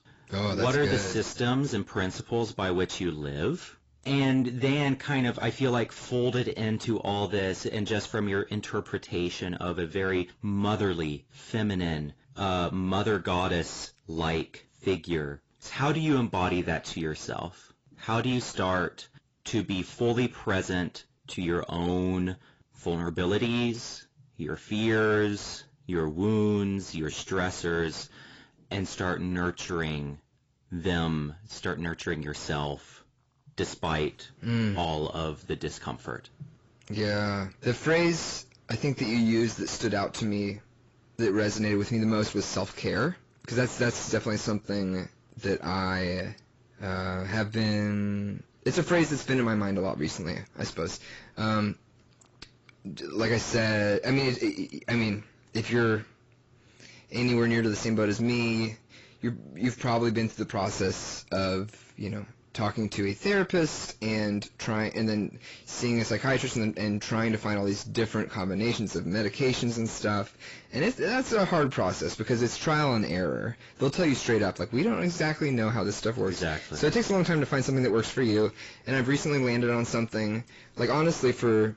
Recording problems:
distortion; heavy; 8 dB below the speech
garbled, watery; badly; nothing above 7.5 kHz

